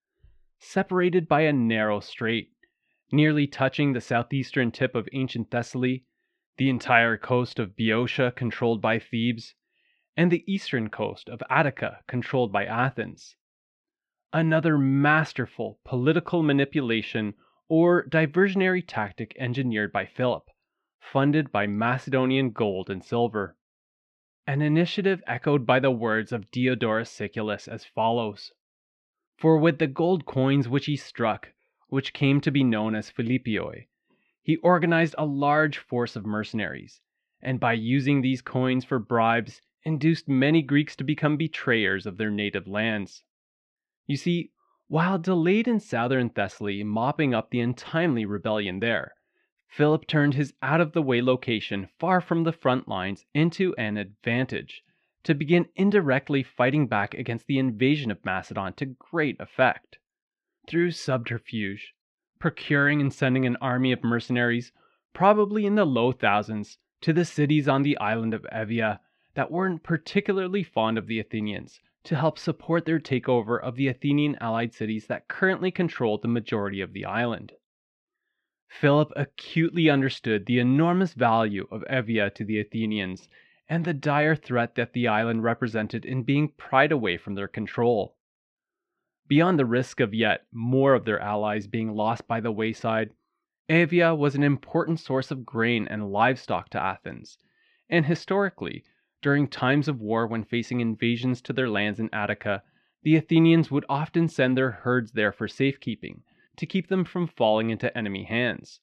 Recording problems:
muffled; very; fading above 2 kHz

